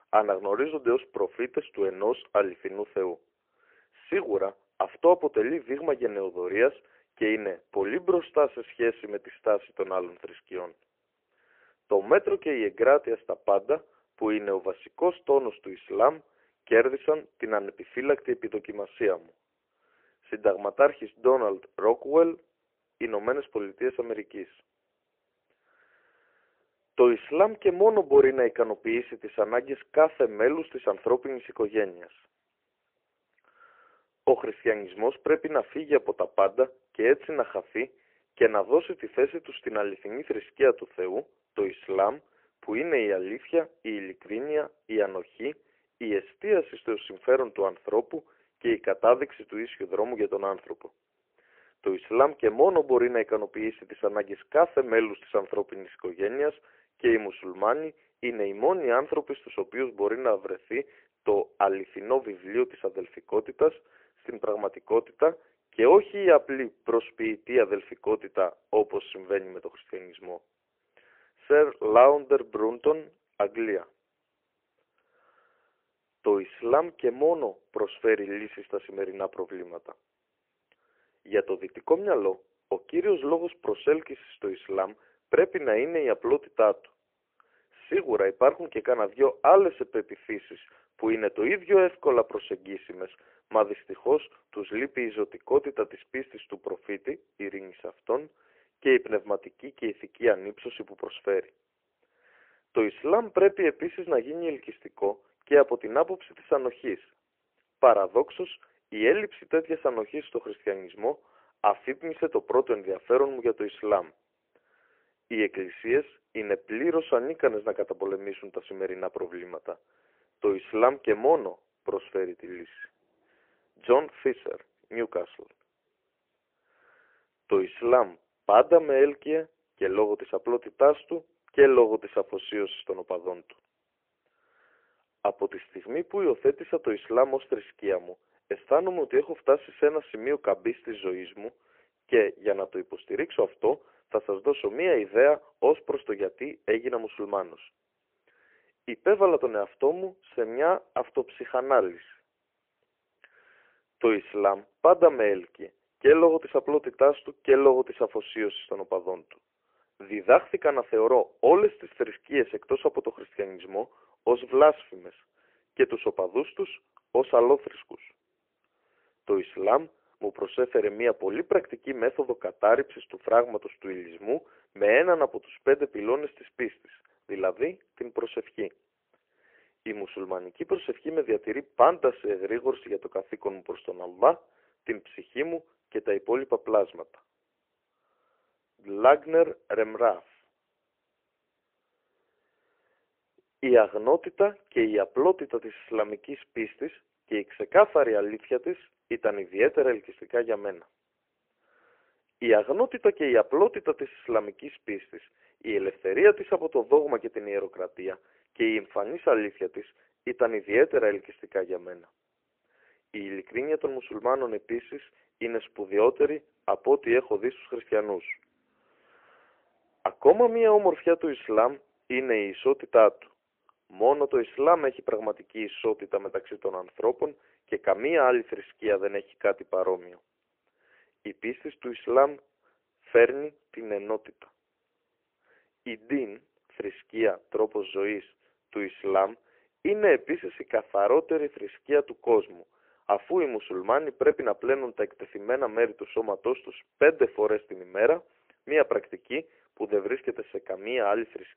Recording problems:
phone-call audio; poor line; nothing above 3 kHz

